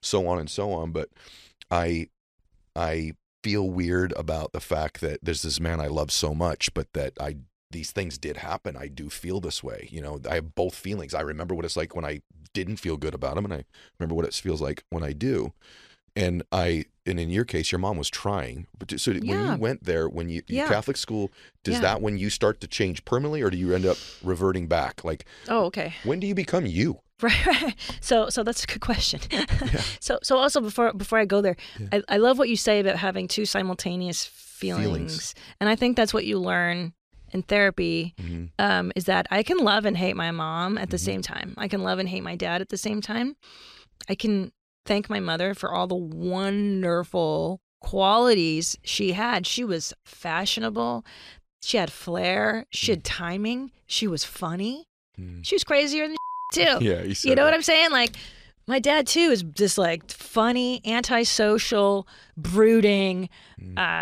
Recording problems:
abrupt cut into speech; at the end

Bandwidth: 14.5 kHz